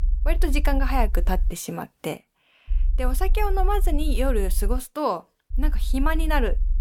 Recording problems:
low rumble; faint; until 1.5 s, from 2.5 to 5 s and from 5.5 s on; 25 dB below the speech

